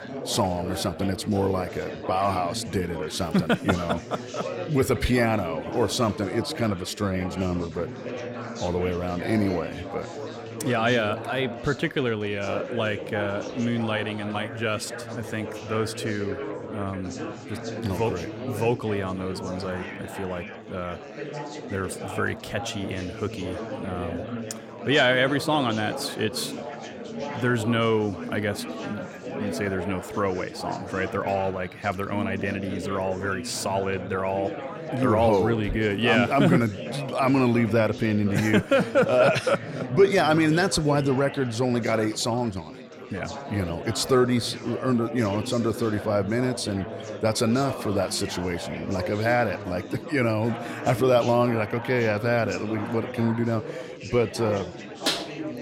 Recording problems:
chatter from many people; loud; throughout; 10 dB below the speech

